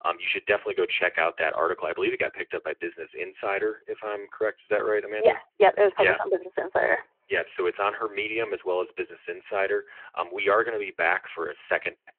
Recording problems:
thin; very; fading below 350 Hz
phone-call audio

